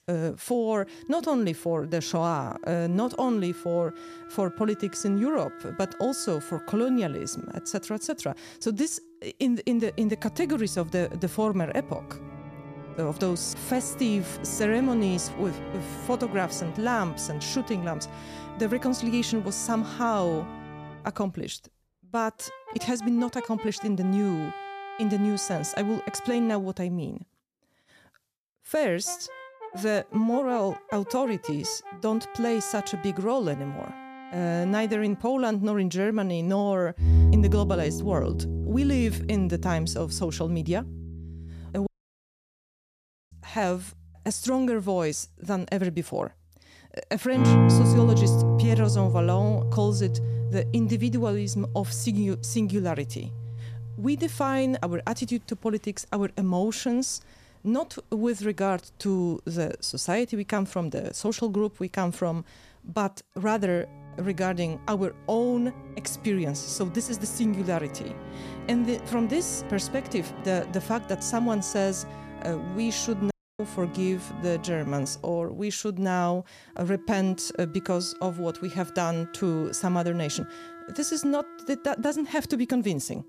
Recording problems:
background music; loud; throughout; 3 dB below the speech
audio cutting out; at 42 s for 1.5 s and at 1:13

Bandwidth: 14.5 kHz